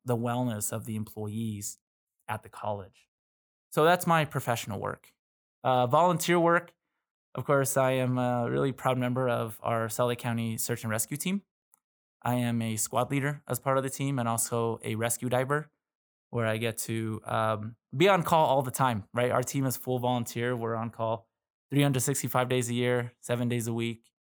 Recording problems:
none

